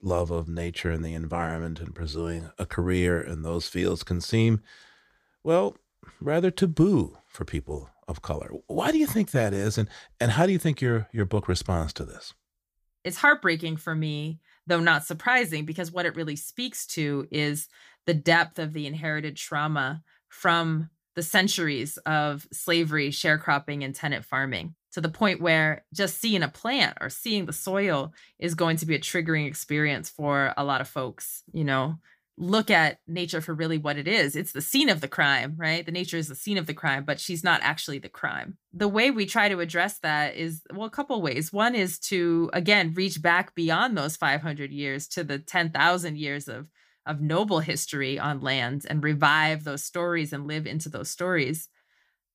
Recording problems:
none

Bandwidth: 15 kHz